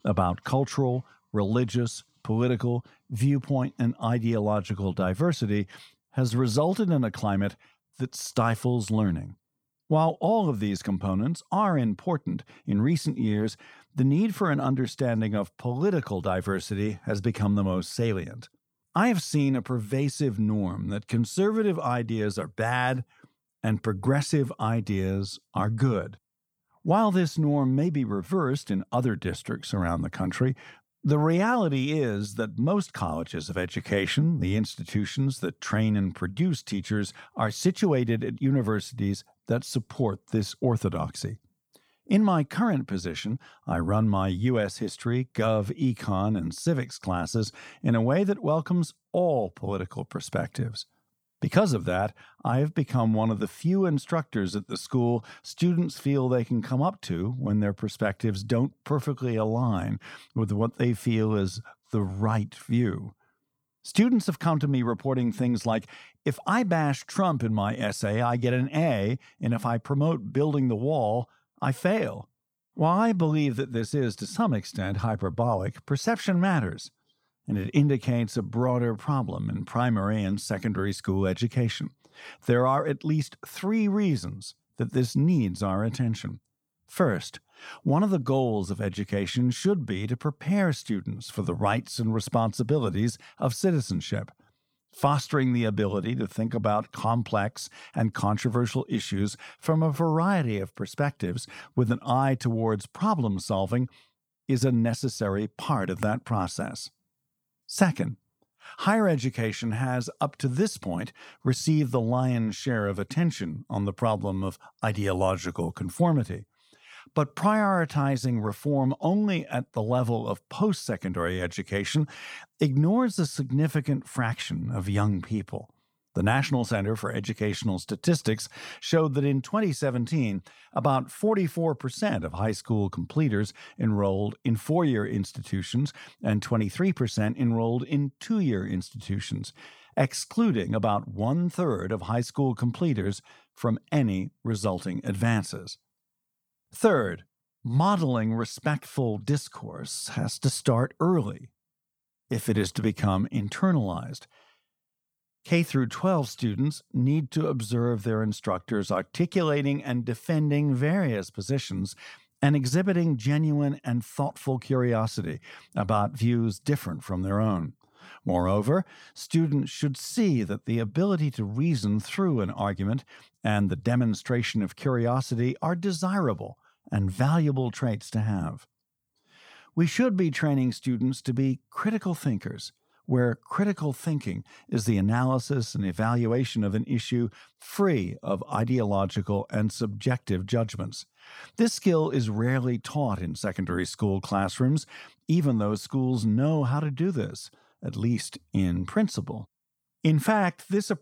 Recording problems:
none

